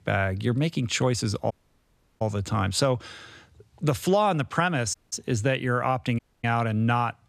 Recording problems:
audio cutting out; at 1.5 s for 0.5 s, at 5 s and at 6 s

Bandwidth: 14.5 kHz